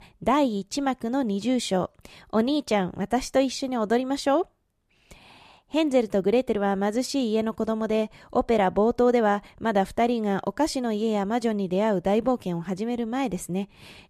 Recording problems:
none

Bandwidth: 14.5 kHz